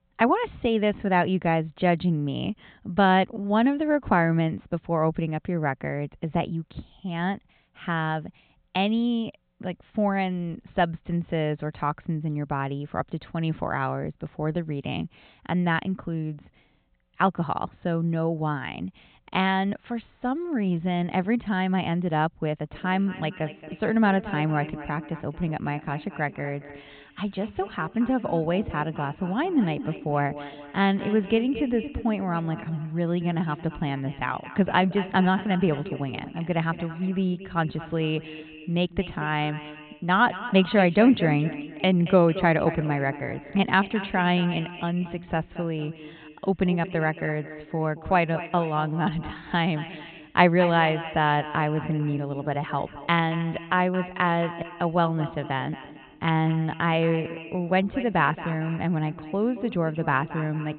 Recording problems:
high frequencies cut off; severe; nothing above 4 kHz
echo of what is said; noticeable; from 23 s on; 230 ms later, 15 dB below the speech

